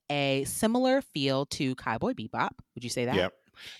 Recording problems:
none

